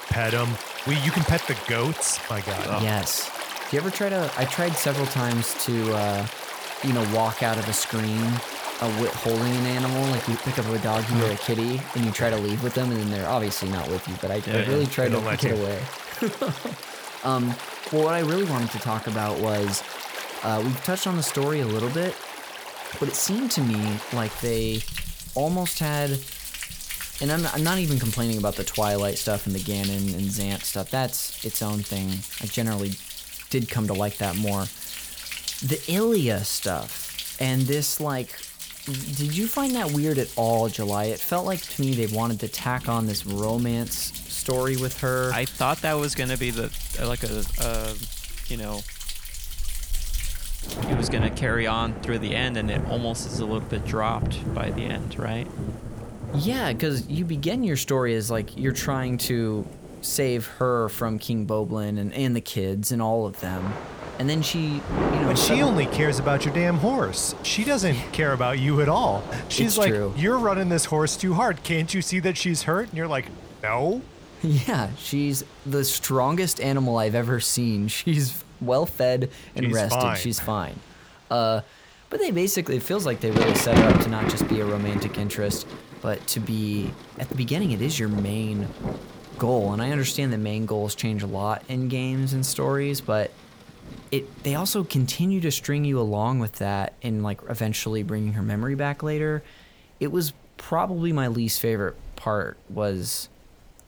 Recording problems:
rain or running water; loud; throughout; 7 dB below the speech

